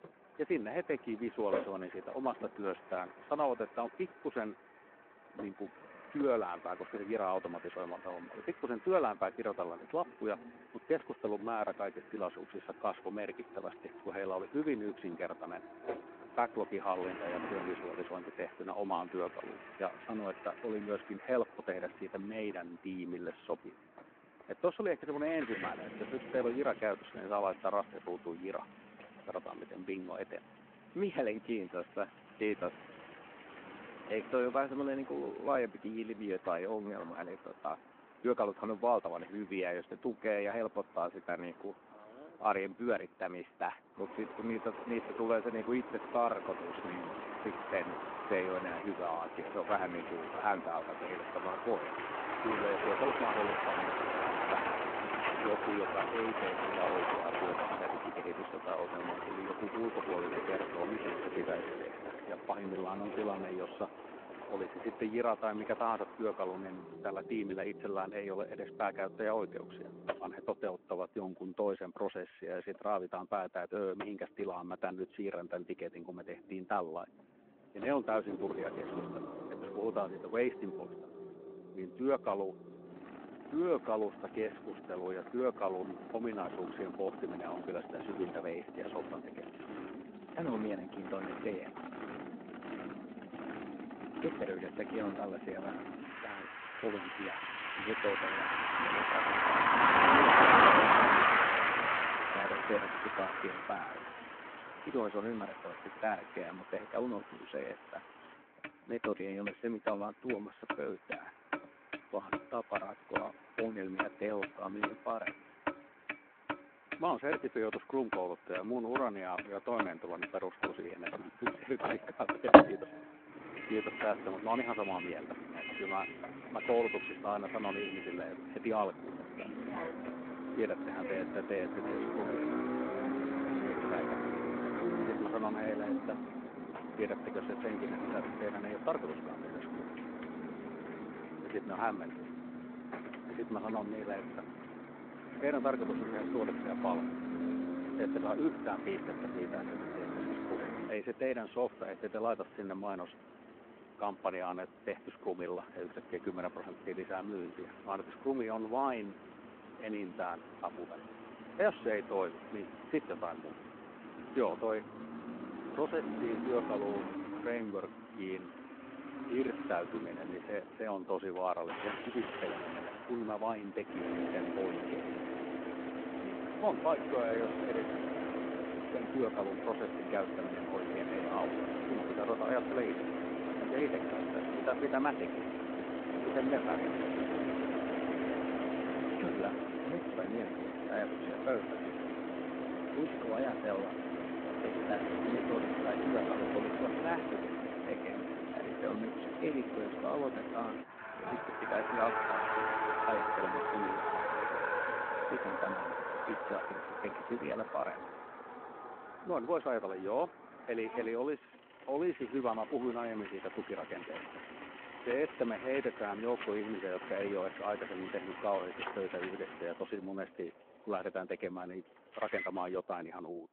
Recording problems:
phone-call audio
traffic noise; very loud; throughout; 2 dB above the speech

